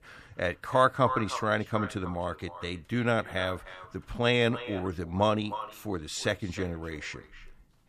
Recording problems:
echo of what is said; strong; throughout; 310 ms later, 10 dB below the speech

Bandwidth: 14.5 kHz